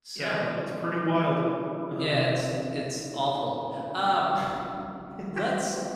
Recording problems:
room echo; strong; dies away in 3 s
off-mic speech; far

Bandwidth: 15 kHz